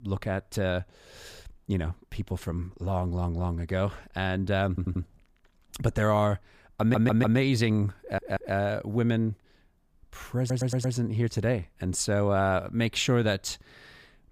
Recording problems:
audio stuttering; 4 times, first at 4.5 s

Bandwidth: 15 kHz